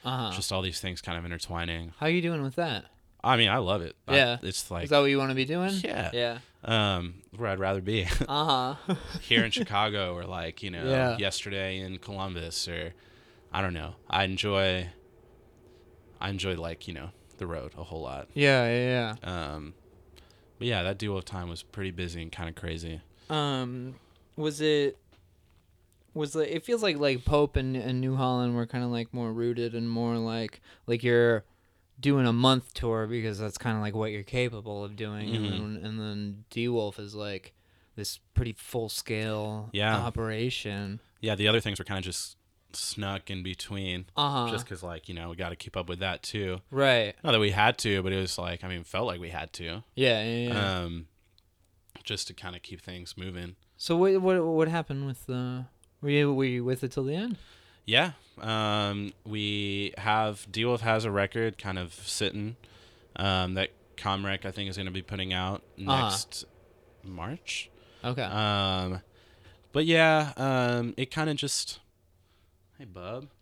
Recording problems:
uneven, jittery; strongly; from 14 s to 1:12

